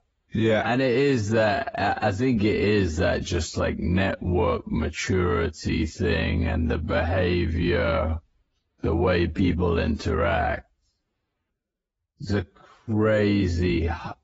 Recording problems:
garbled, watery; badly; nothing above 7.5 kHz
wrong speed, natural pitch; too slow; 0.6 times normal speed

